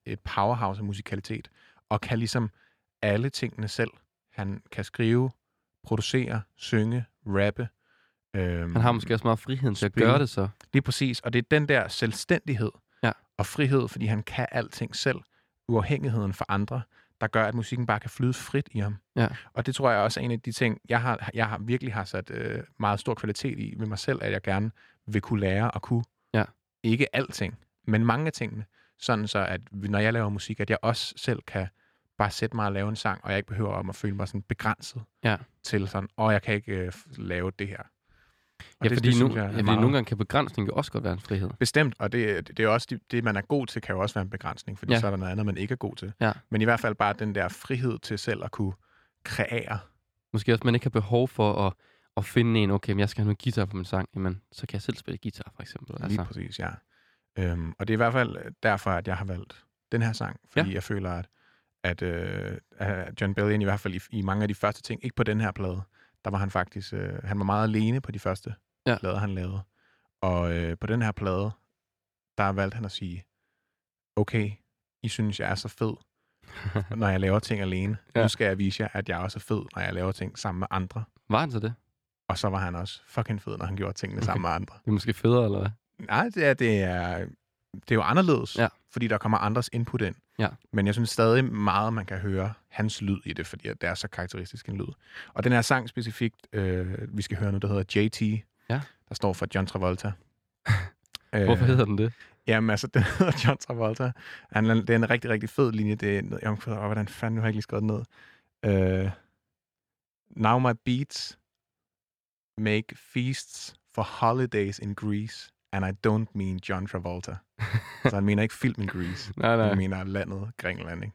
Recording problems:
none

